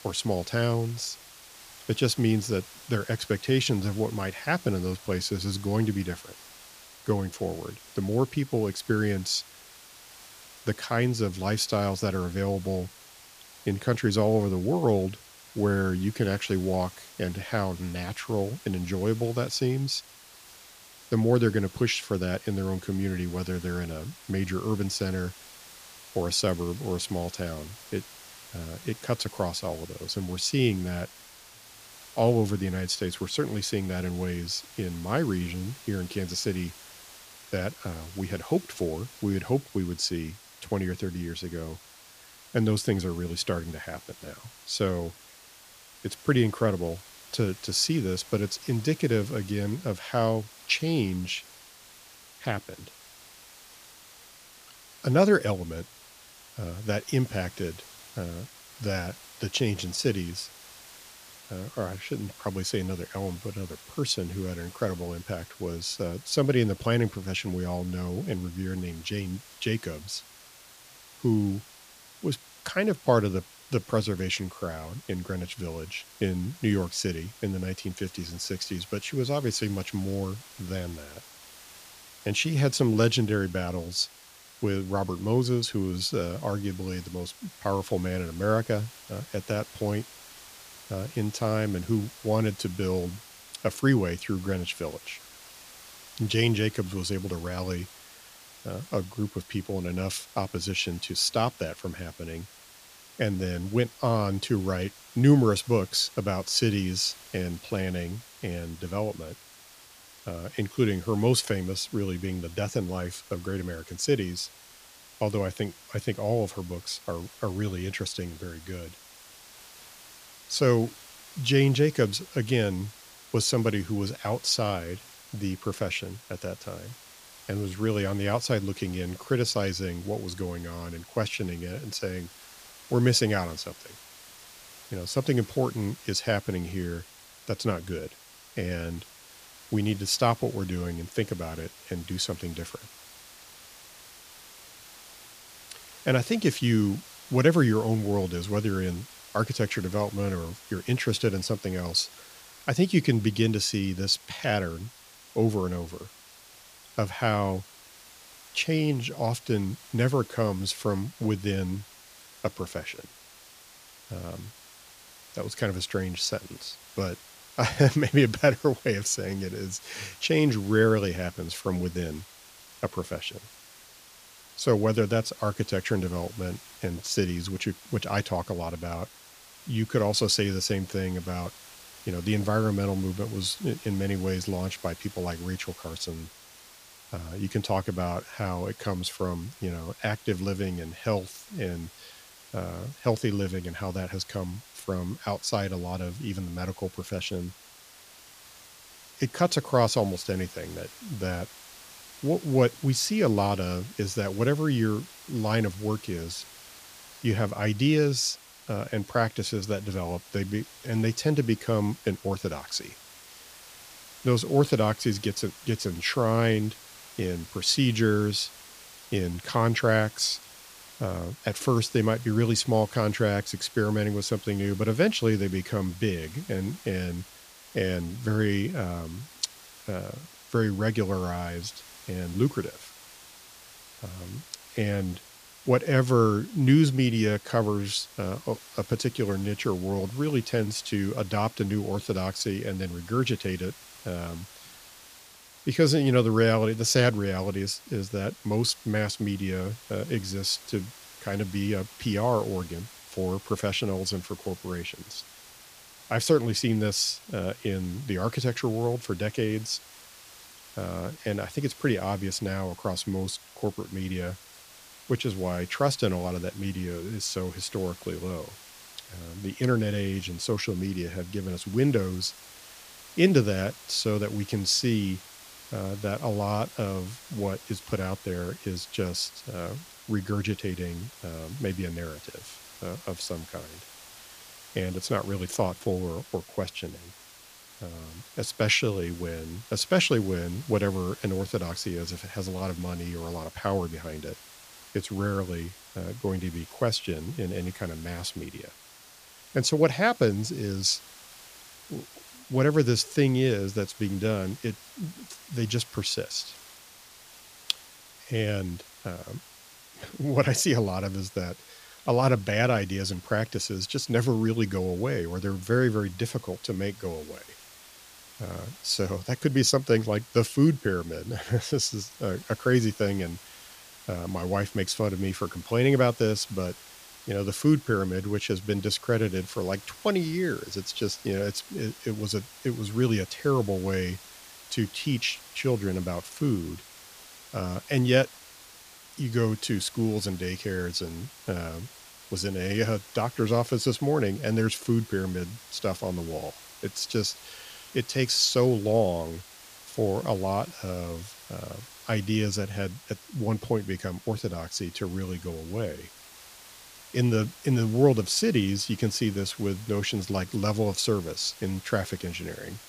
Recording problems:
hiss; noticeable; throughout; 20 dB below the speech

